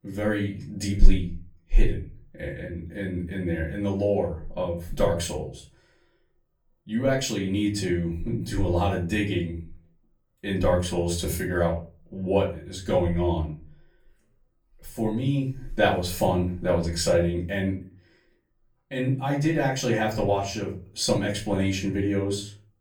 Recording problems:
off-mic speech; far
room echo; slight; dies away in 0.3 s

